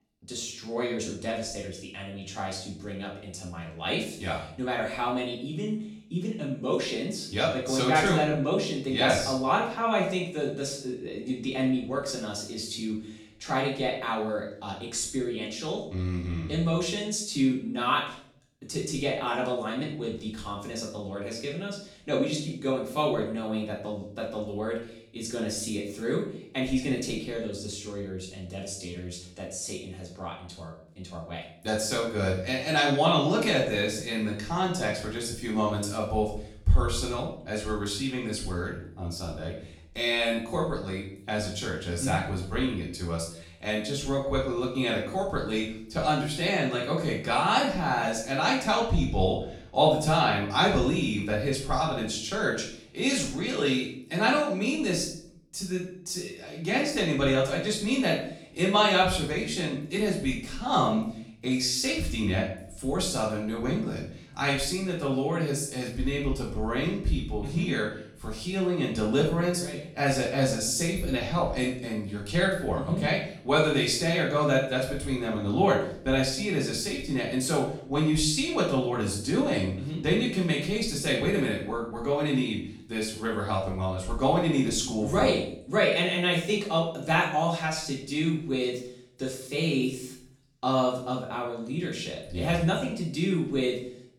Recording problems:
off-mic speech; far
room echo; noticeable; dies away in 0.5 s

